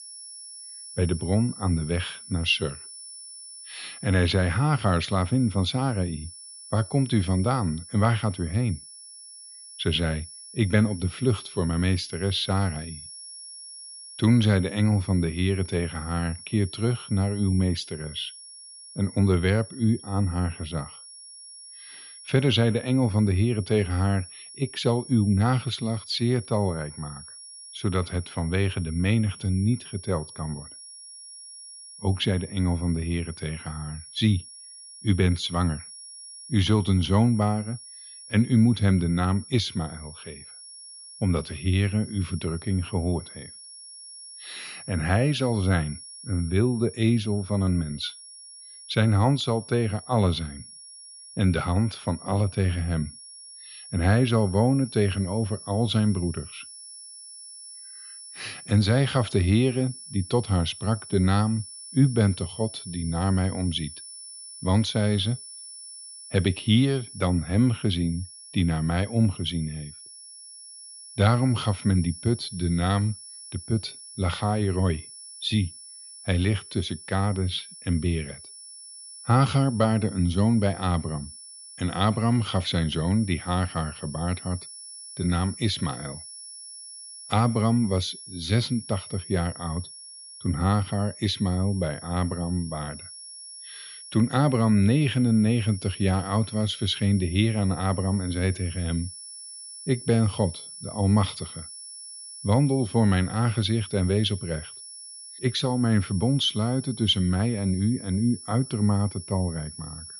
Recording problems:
muffled; very; fading above 3 kHz
high-pitched whine; noticeable; throughout; 10 kHz, 15 dB below the speech

